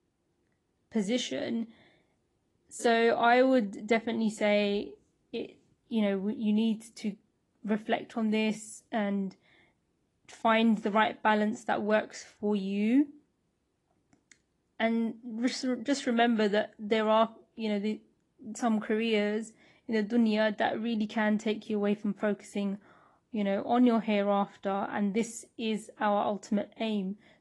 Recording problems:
garbled, watery; slightly; nothing above 11 kHz

